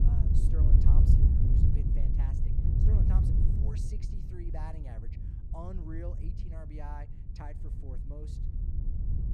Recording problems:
wind noise on the microphone; heavy; 5 dB above the speech

